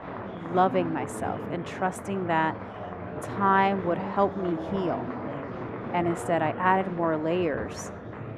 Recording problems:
muffled; very; fading above 2.5 kHz
murmuring crowd; loud; throughout; 8 dB below the speech

